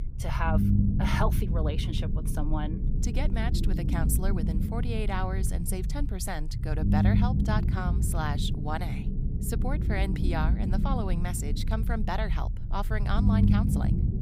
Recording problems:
low rumble; loud; throughout; 4 dB below the speech

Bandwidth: 15.5 kHz